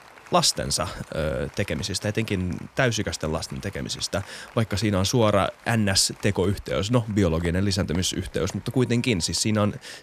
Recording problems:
crowd noise; faint; throughout; 25 dB below the speech

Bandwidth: 14.5 kHz